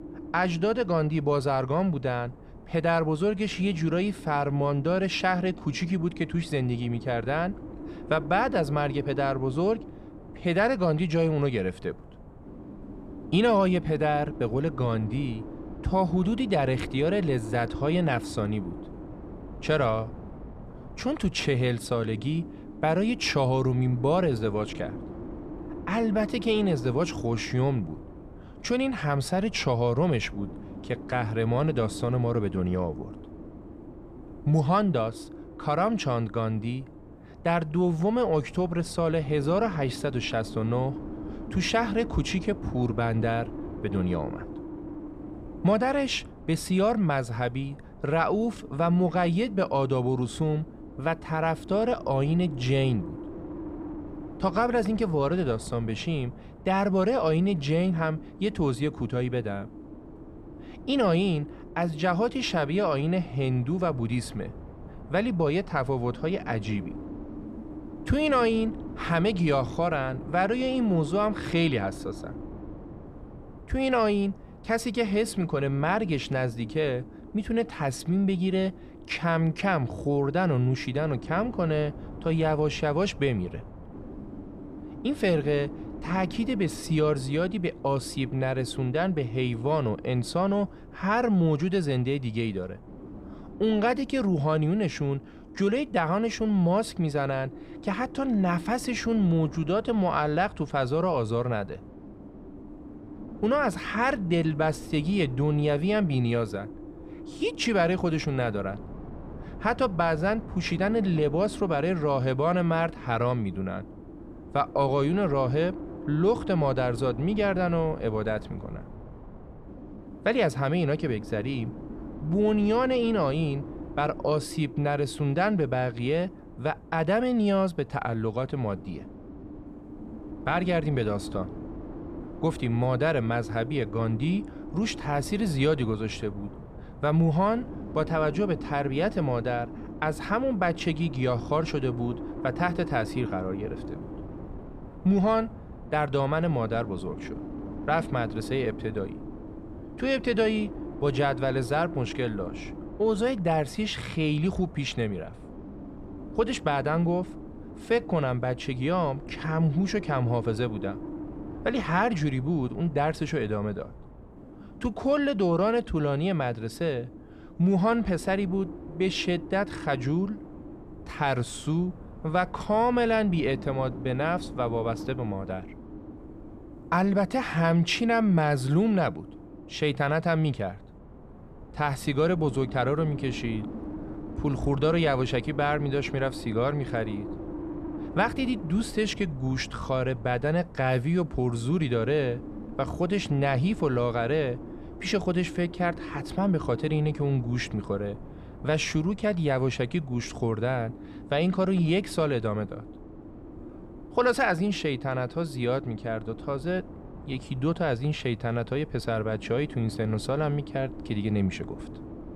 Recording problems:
wind noise on the microphone; occasional gusts; 15 dB below the speech

